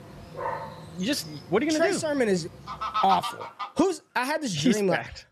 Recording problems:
animal sounds; loud; until 3.5 s; 9 dB below the speech

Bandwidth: 13.5 kHz